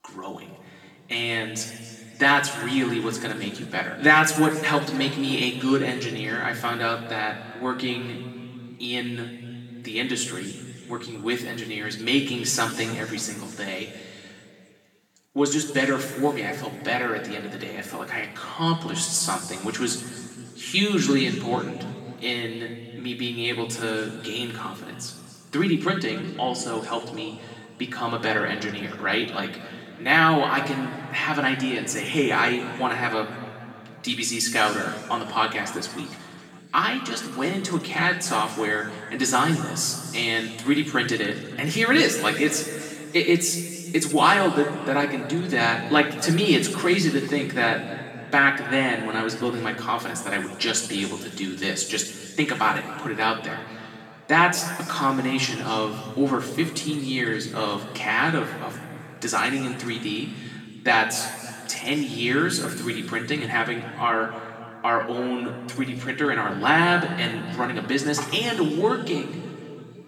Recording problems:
off-mic speech; far
room echo; noticeable; dies away in 2.3 s

